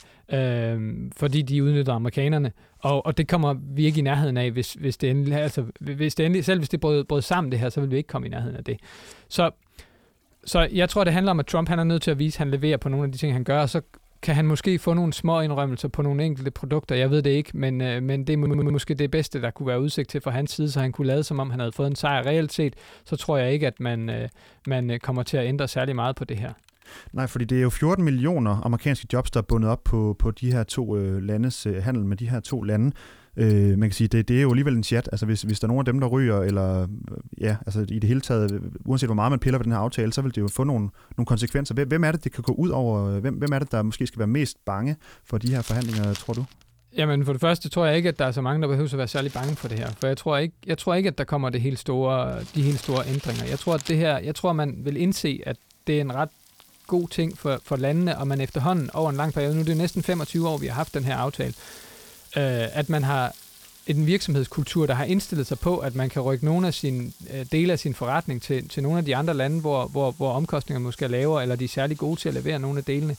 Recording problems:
household noises; faint; throughout; 20 dB below the speech
audio stuttering; at 18 s

